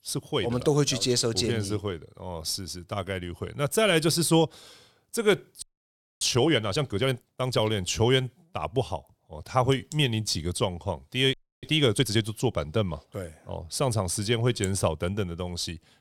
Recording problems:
audio freezing; at 5.5 s for 0.5 s and at 11 s

